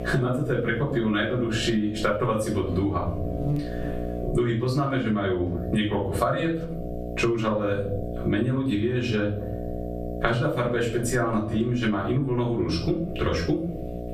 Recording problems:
off-mic speech; far
room echo; slight; dies away in 0.4 s
squashed, flat; somewhat
electrical hum; noticeable; throughout; 60 Hz, 10 dB below the speech

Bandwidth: 15 kHz